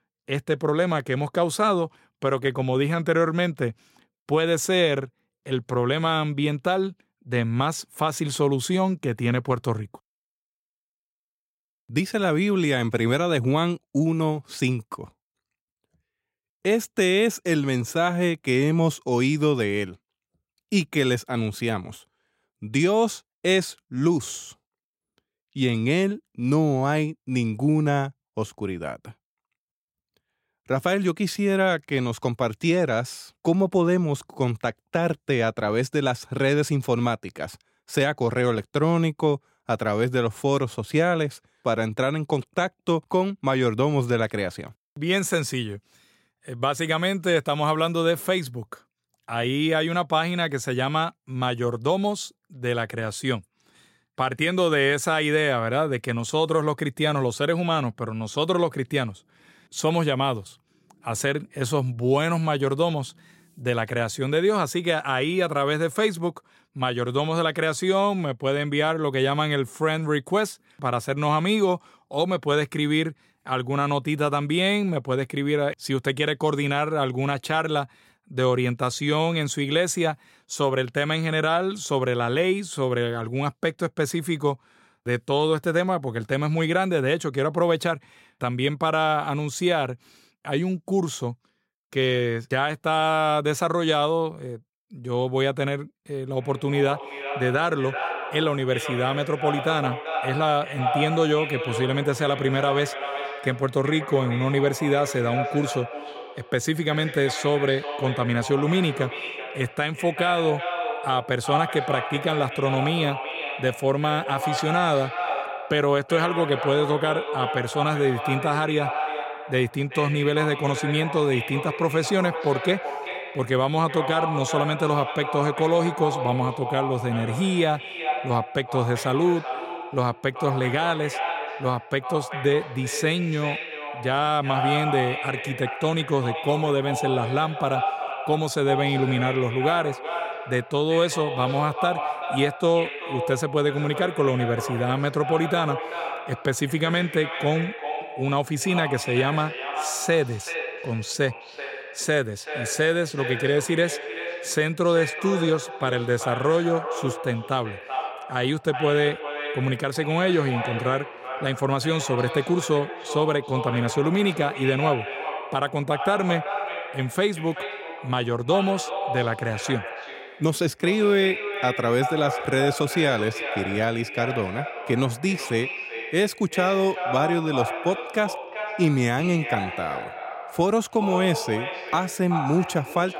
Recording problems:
echo of what is said; strong; from 1:36 on; 380 ms later, 7 dB below the speech

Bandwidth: 16 kHz